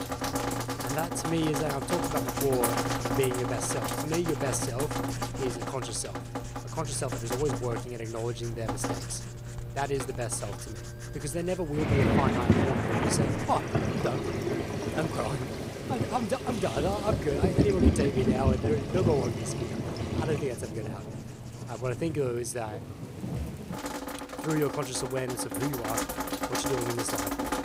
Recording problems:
rain or running water; very loud; throughout; 1 dB above the speech
household noises; loud; until 22 s; 7 dB below the speech
background music; faint; throughout; 30 dB below the speech

